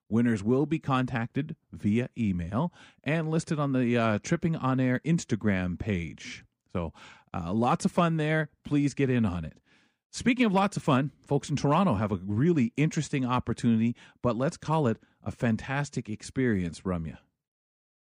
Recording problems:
none

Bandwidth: 15 kHz